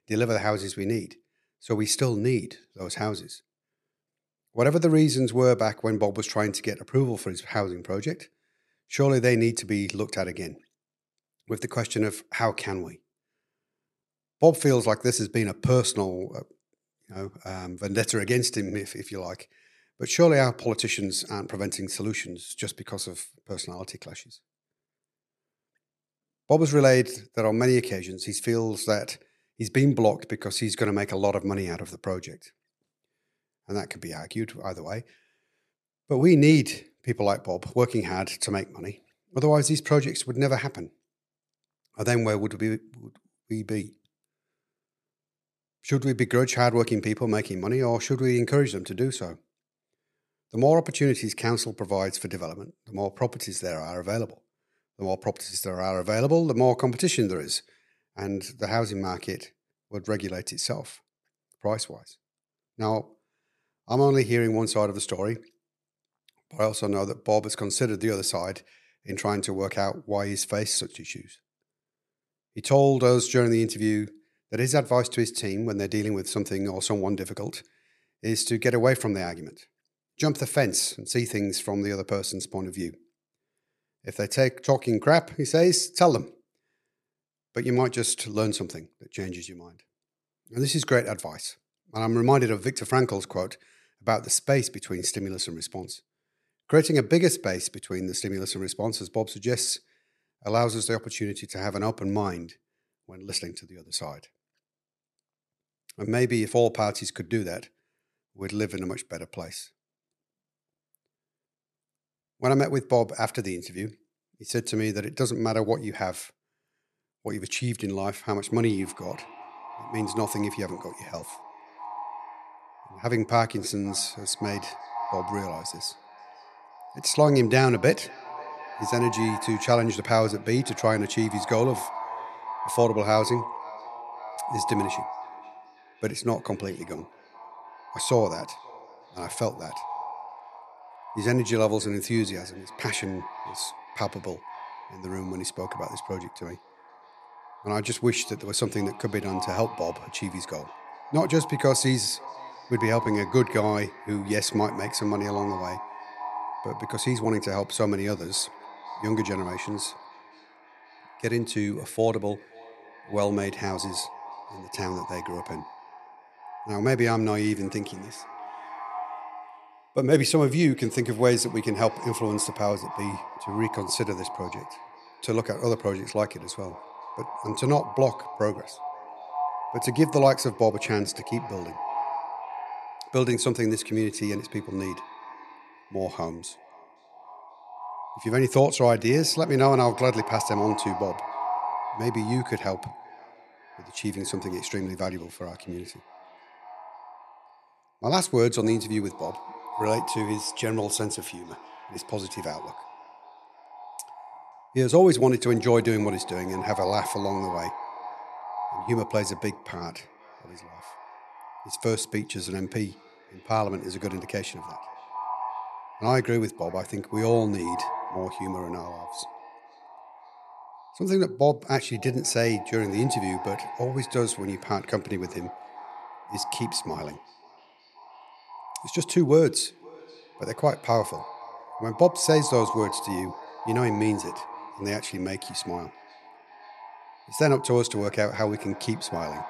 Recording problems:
echo of what is said; noticeable; from 1:58 on; 530 ms later, 10 dB below the speech

